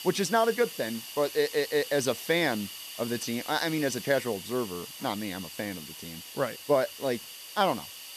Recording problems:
hiss; noticeable; throughout; 10 dB below the speech

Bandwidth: 14 kHz